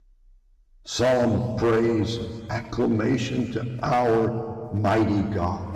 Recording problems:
echo of what is said; faint; throughout; 130 ms later, 25 dB below the speech
room echo; slight; dies away in 1.8 s
distortion; slight; 6% of the sound clipped
off-mic speech; somewhat distant
electrical hum; faint; from 1 to 2 s, from 3 to 4 s and from 4.5 s on; 50 Hz, 25 dB below the speech

